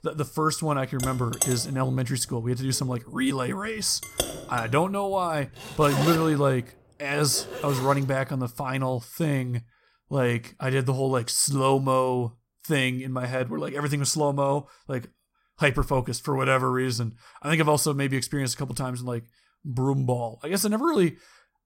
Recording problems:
household noises; loud; until 7.5 s; 7 dB below the speech

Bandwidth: 16 kHz